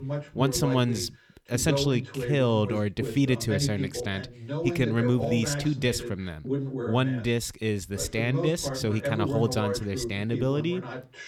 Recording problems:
voice in the background; loud; throughout; 5 dB below the speech

